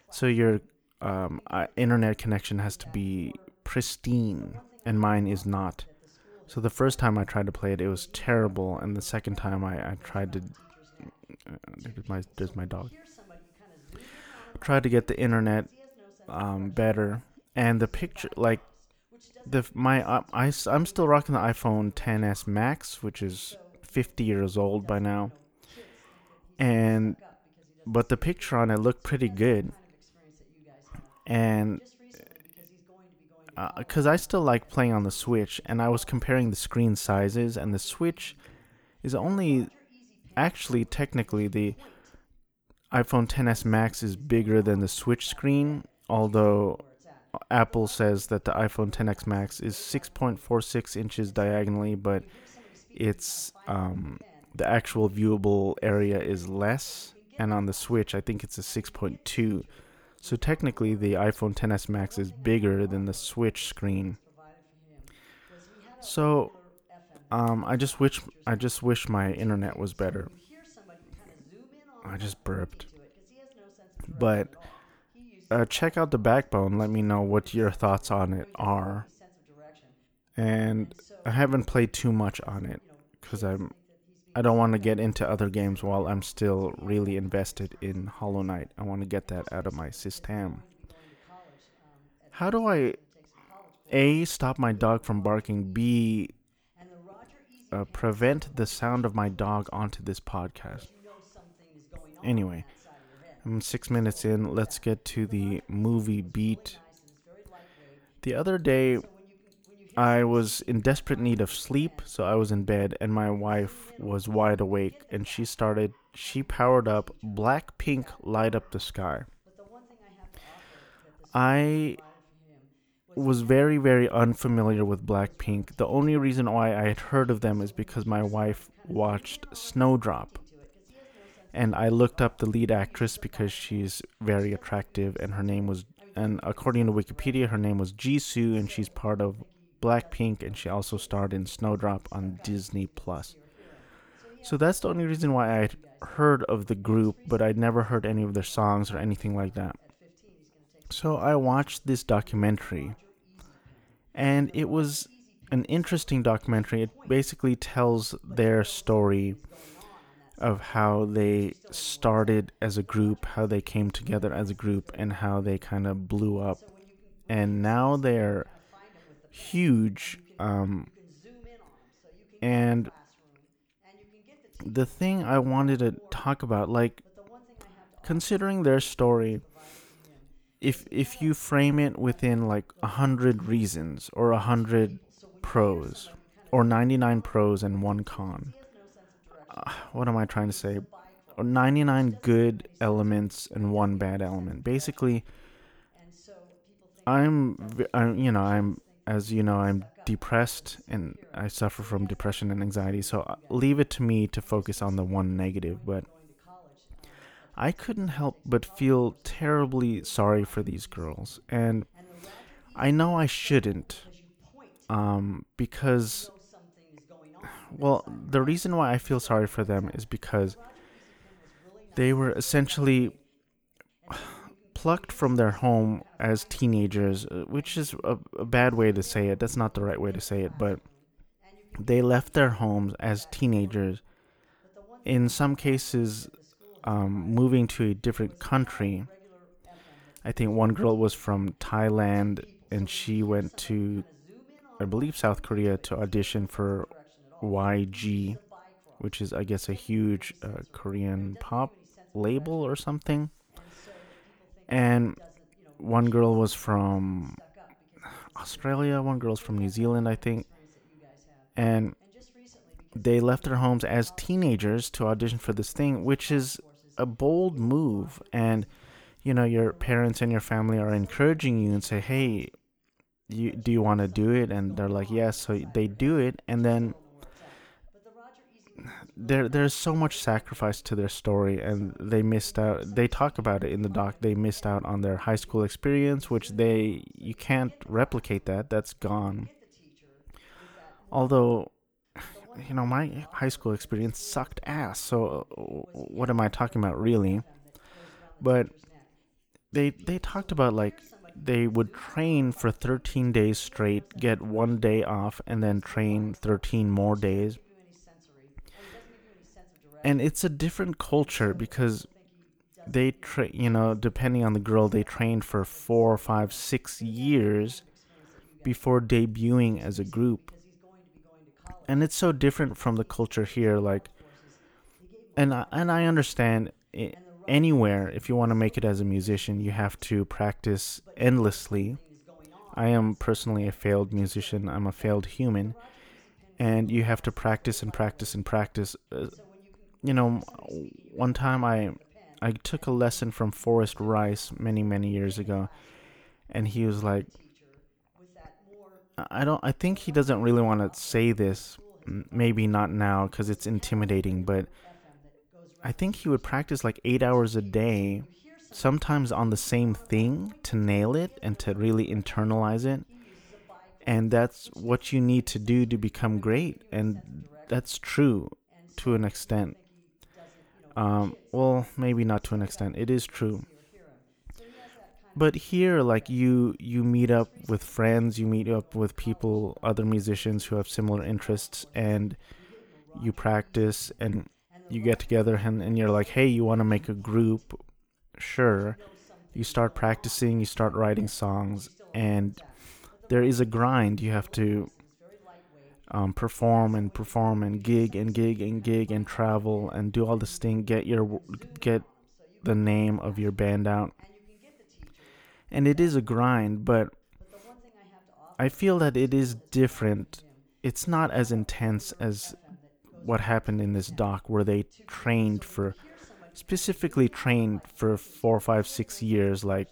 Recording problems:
voice in the background; faint; throughout; 30 dB below the speech

